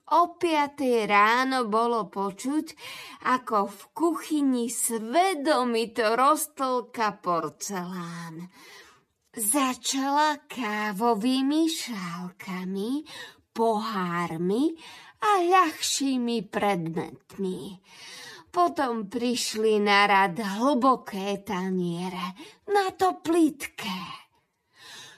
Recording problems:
wrong speed, natural pitch; too slow; 0.6 times normal speed

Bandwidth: 14 kHz